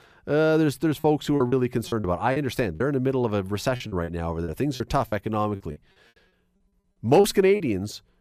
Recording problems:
choppy; very; 10% of the speech affected

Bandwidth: 14.5 kHz